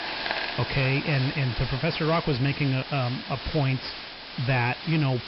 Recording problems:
high frequencies cut off; noticeable; nothing above 5.5 kHz
distortion; slight; 10 dB below the speech
hiss; loud; throughout; 7 dB below the speech

